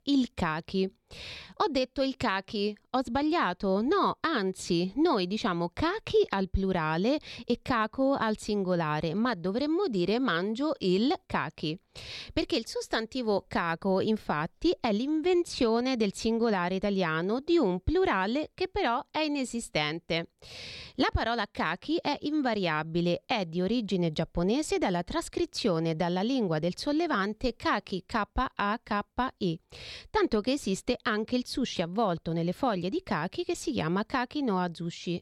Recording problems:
none

